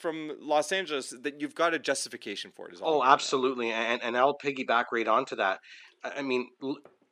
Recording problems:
thin; very slightly; fading below 300 Hz

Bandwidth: 15 kHz